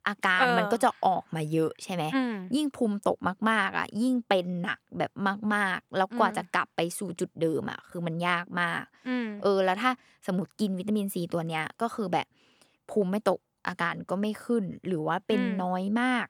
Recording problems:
none

